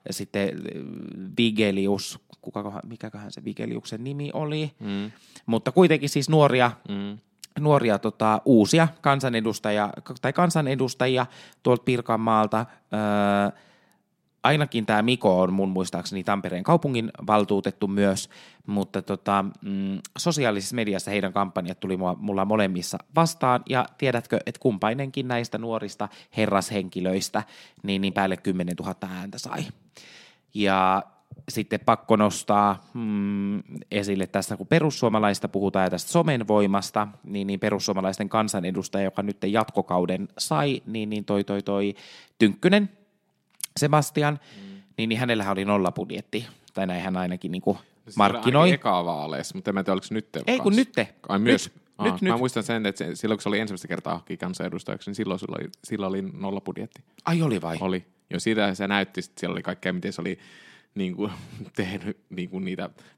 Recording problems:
none

